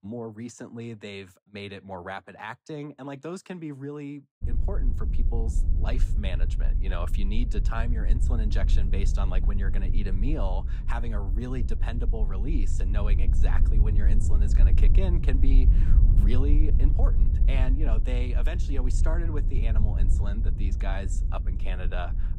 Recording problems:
wind noise on the microphone; heavy; from 4.5 s on; 7 dB below the speech

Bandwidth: 15.5 kHz